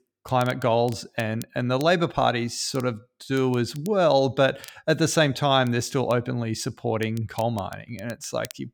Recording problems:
crackle, like an old record; faint; 25 dB below the speech

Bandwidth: 19 kHz